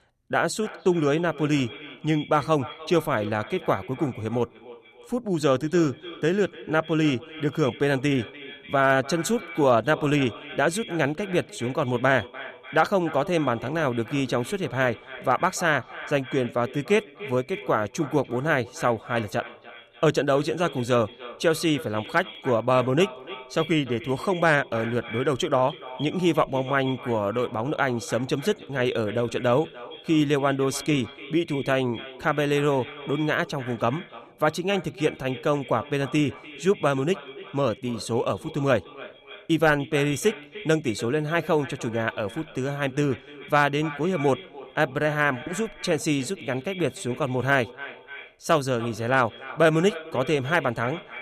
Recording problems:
echo of what is said; noticeable; throughout; 300 ms later, 15 dB below the speech

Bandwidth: 14.5 kHz